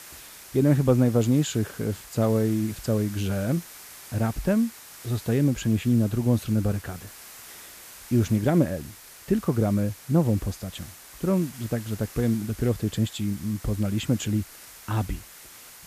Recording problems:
hiss; noticeable; throughout; 15 dB below the speech

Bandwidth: 14.5 kHz